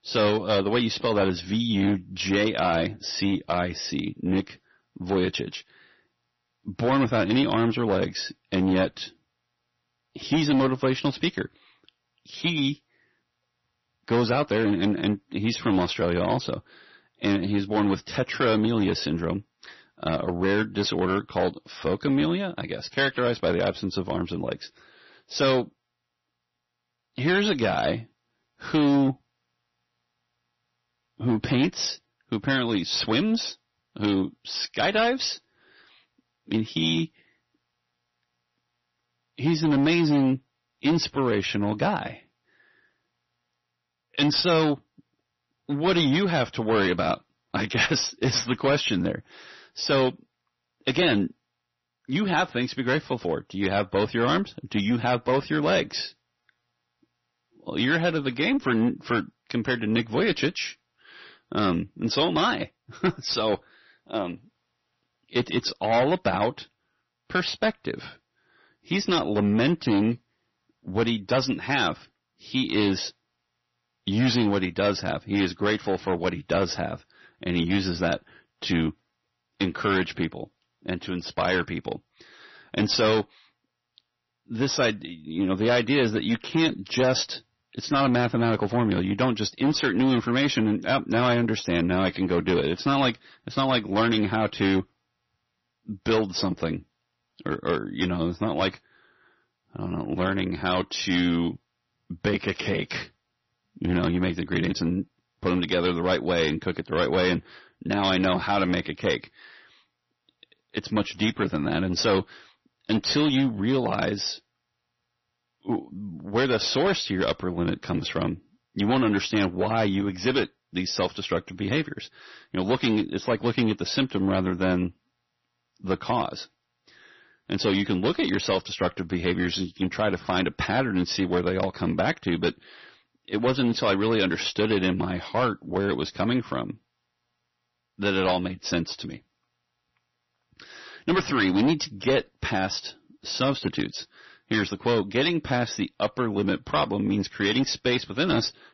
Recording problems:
distortion; slight; 7% of the sound clipped
garbled, watery; slightly; nothing above 6 kHz

